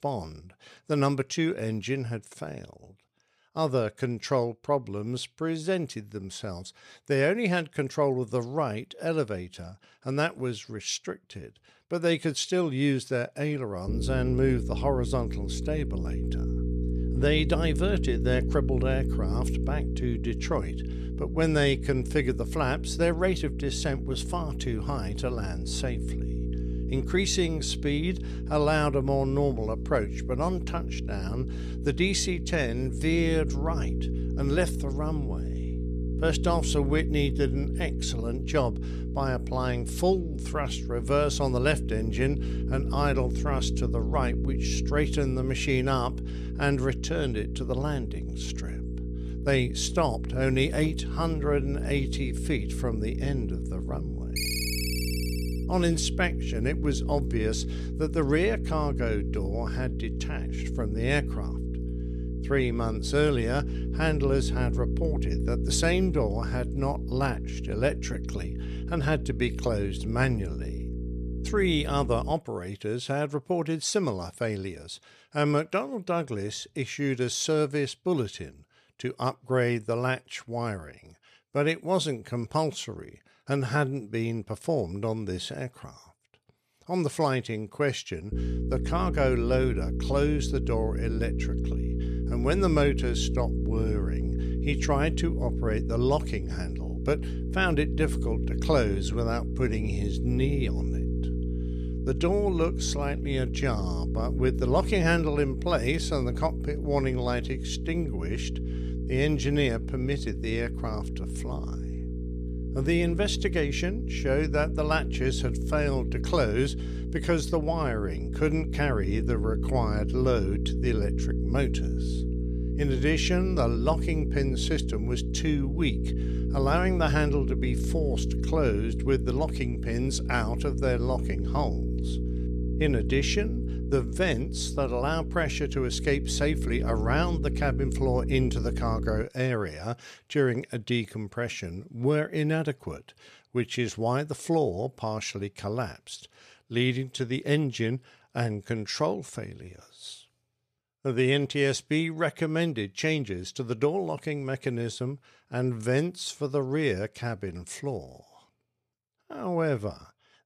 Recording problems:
electrical hum; noticeable; from 14 s to 1:12 and from 1:28 to 2:19; 60 Hz, 10 dB below the speech
phone ringing; loud; from 54 to 56 s; peak level with the speech

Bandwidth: 14 kHz